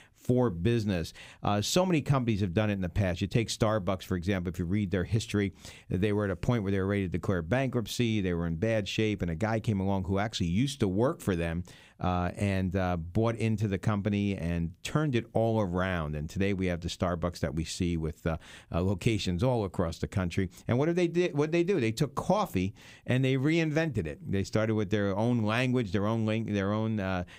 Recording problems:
none

